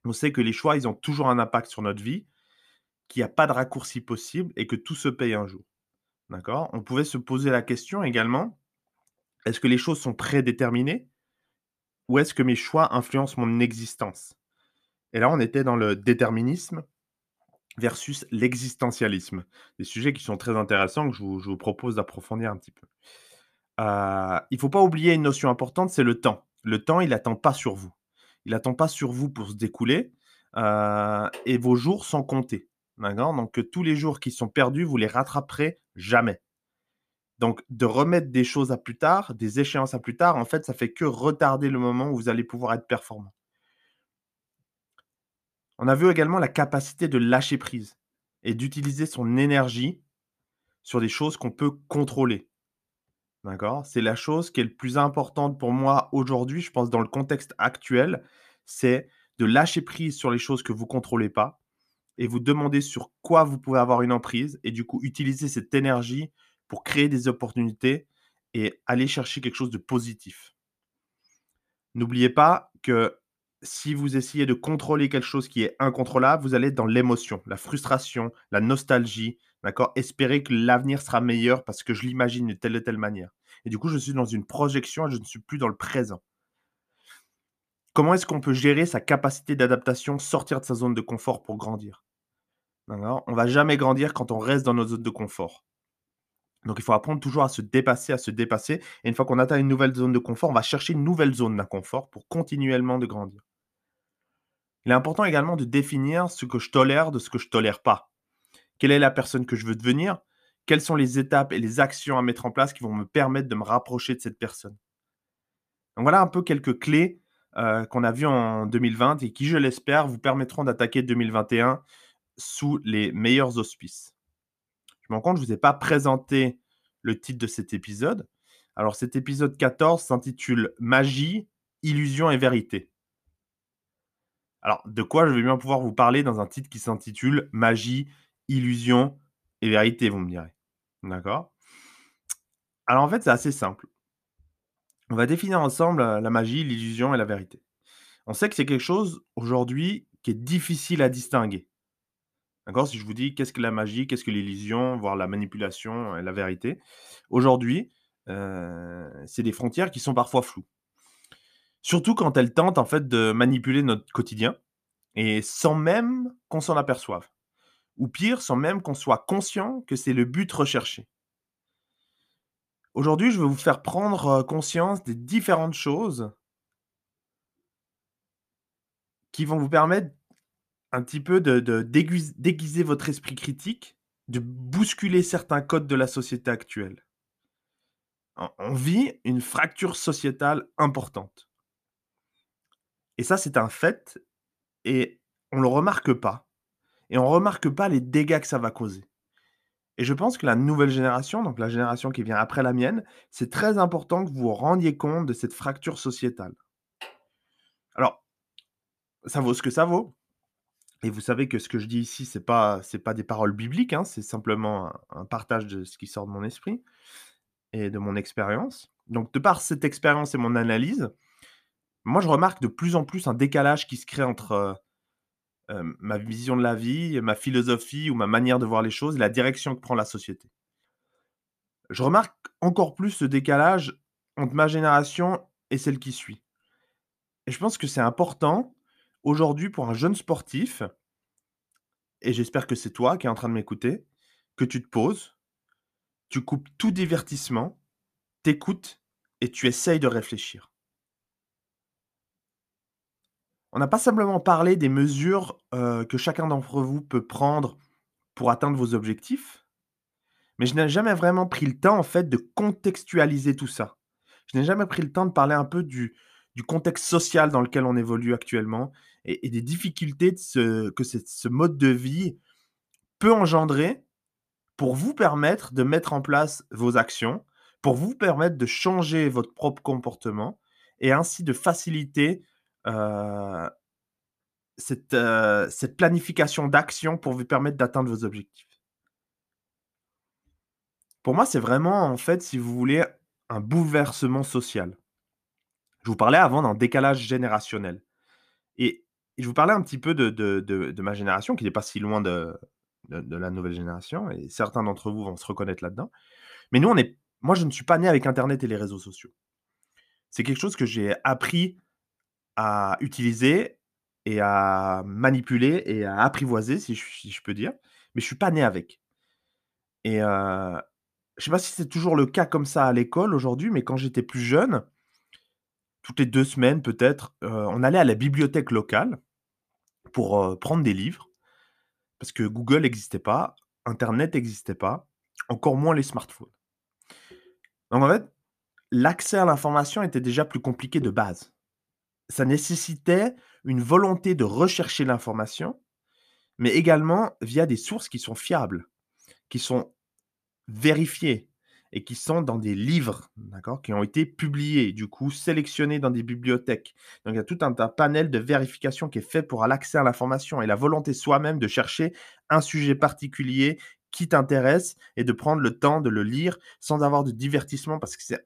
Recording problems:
none

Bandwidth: 14.5 kHz